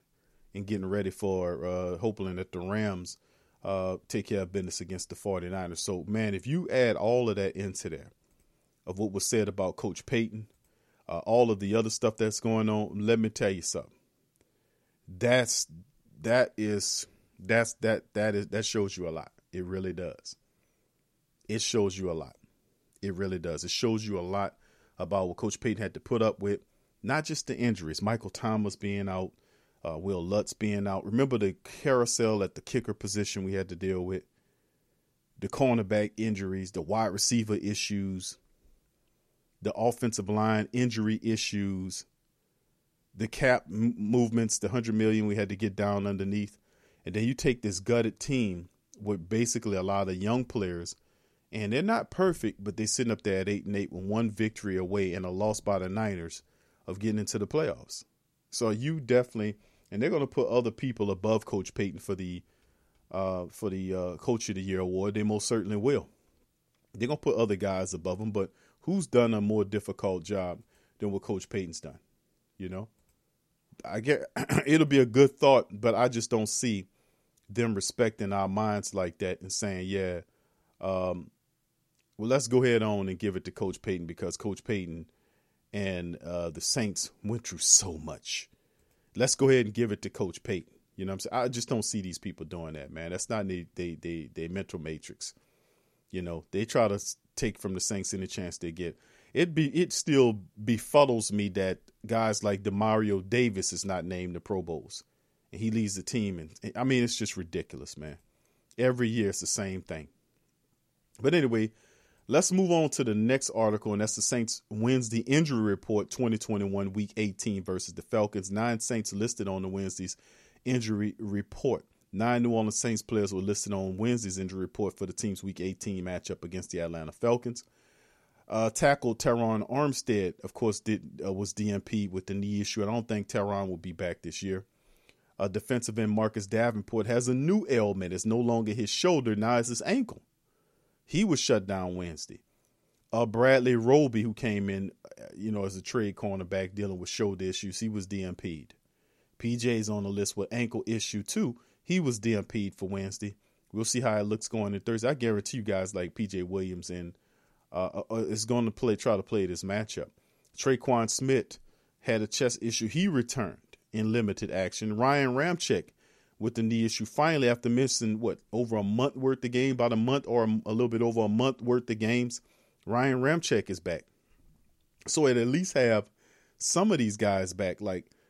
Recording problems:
none

